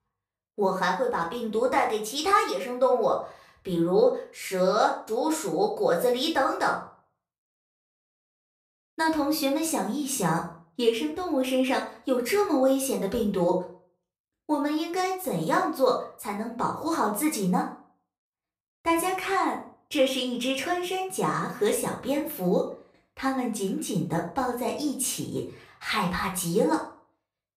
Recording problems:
off-mic speech; far
room echo; slight; dies away in 0.4 s

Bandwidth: 15 kHz